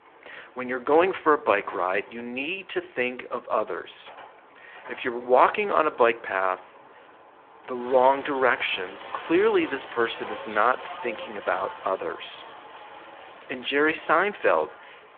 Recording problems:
phone-call audio
traffic noise; noticeable; throughout; 15 dB below the speech

